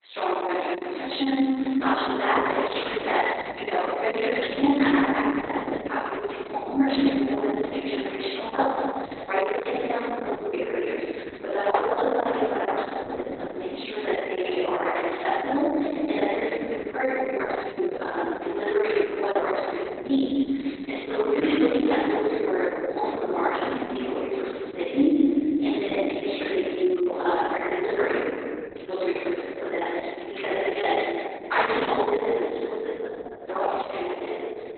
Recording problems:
room echo; strong; dies away in 2.8 s
off-mic speech; far
garbled, watery; badly; nothing above 4 kHz
thin; very slightly; fading below 250 Hz

